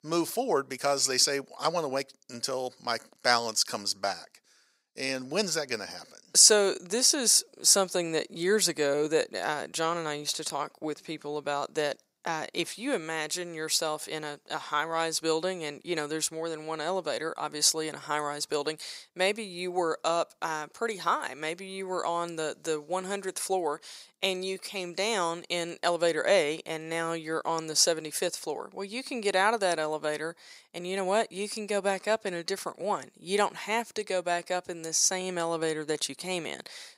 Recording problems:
thin; very; fading below 500 Hz

